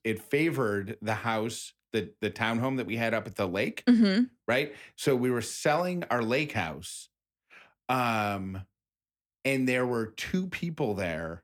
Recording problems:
none

